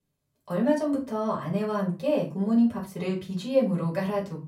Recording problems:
off-mic speech; far
room echo; slight; dies away in 0.3 s

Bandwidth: 16 kHz